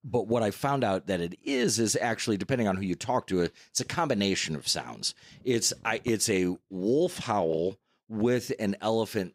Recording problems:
none

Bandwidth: 15.5 kHz